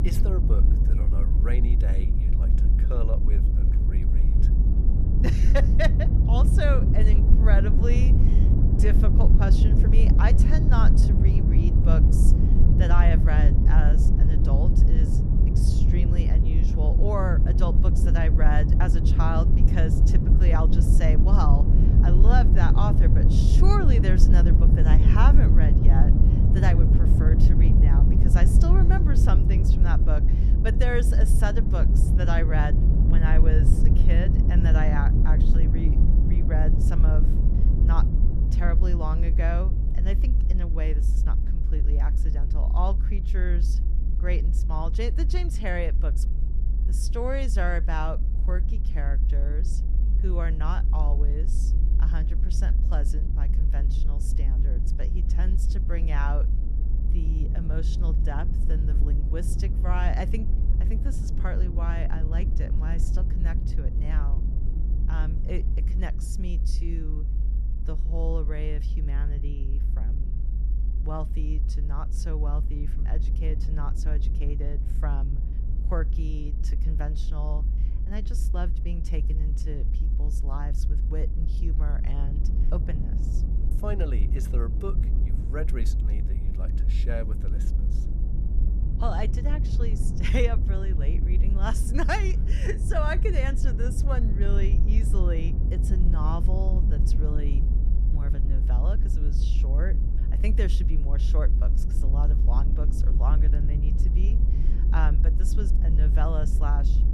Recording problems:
low rumble; loud; throughout; 4 dB below the speech

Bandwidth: 14.5 kHz